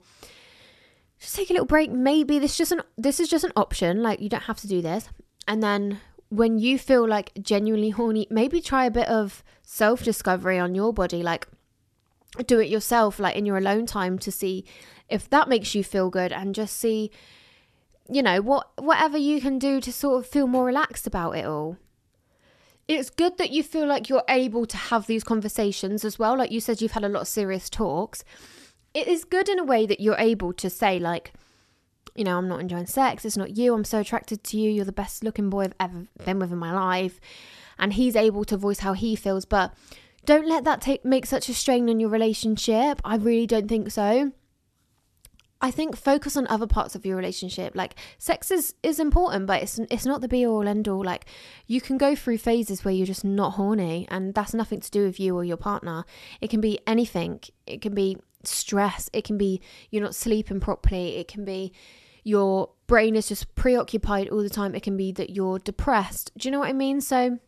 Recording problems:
none

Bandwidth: 13.5 kHz